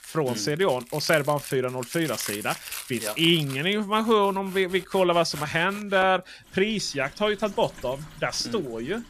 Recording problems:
household noises; noticeable; throughout; 15 dB below the speech

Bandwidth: 14.5 kHz